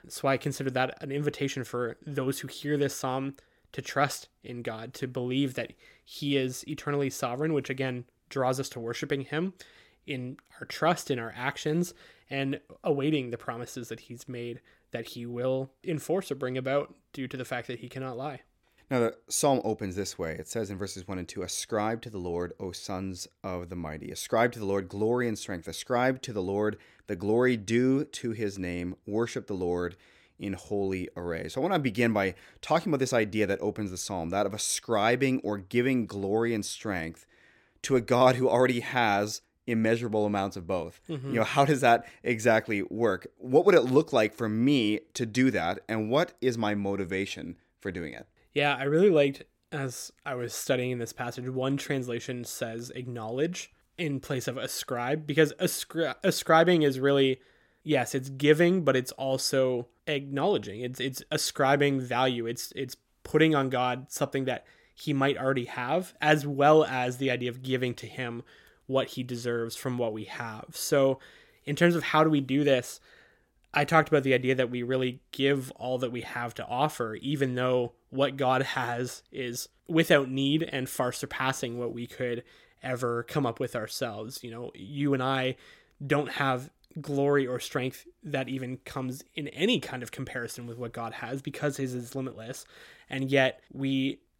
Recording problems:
none

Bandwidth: 16.5 kHz